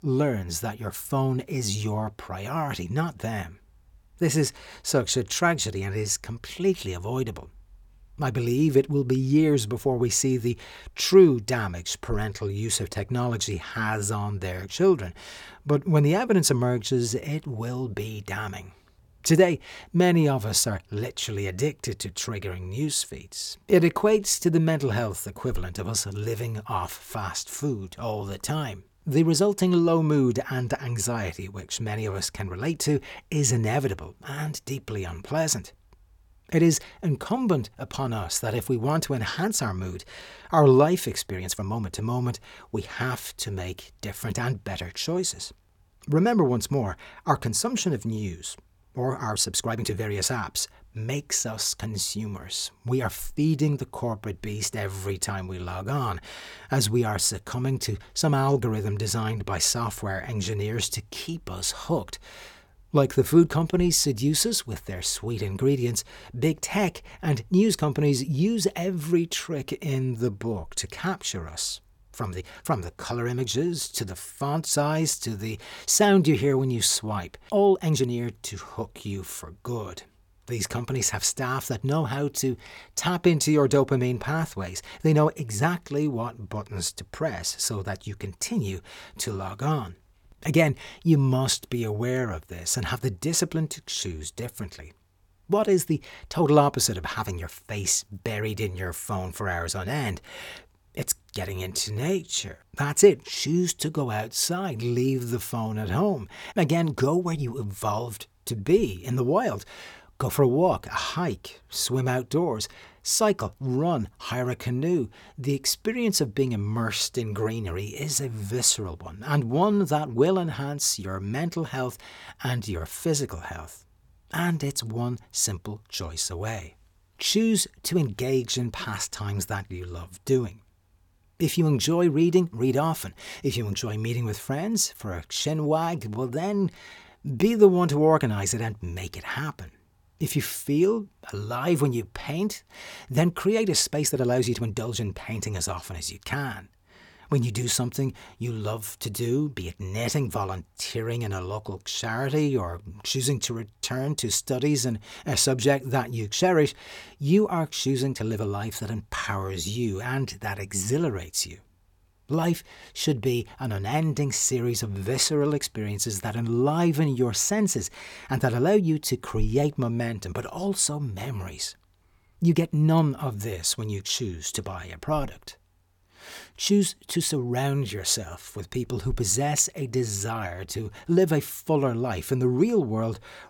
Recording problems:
uneven, jittery; strongly; from 23 s to 3:01

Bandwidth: 17.5 kHz